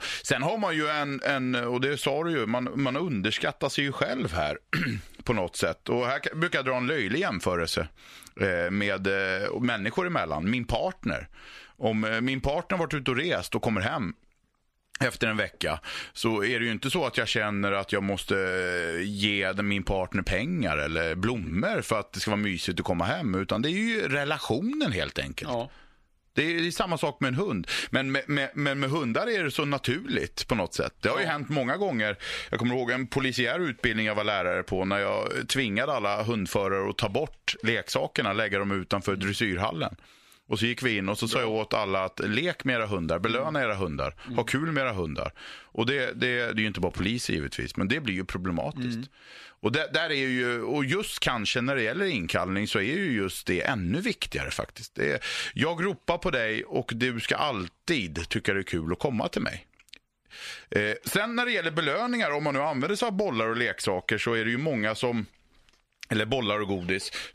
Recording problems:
squashed, flat; somewhat

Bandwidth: 14.5 kHz